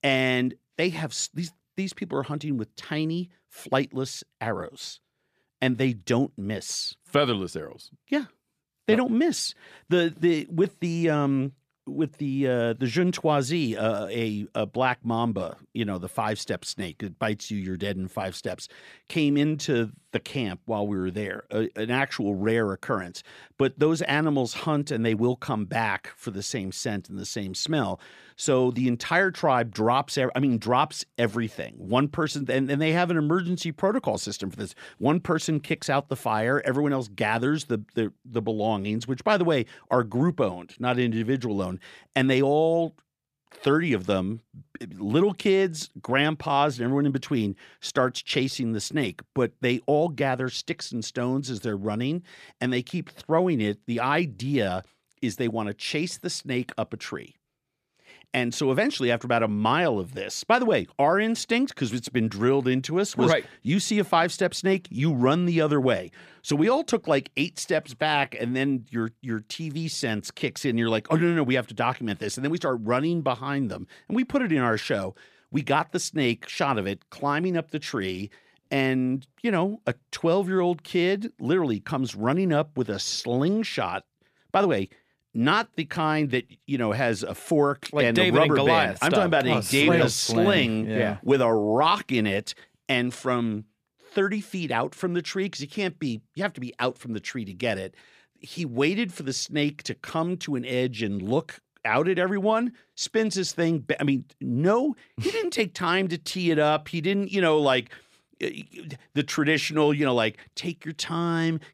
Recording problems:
none

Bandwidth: 14.5 kHz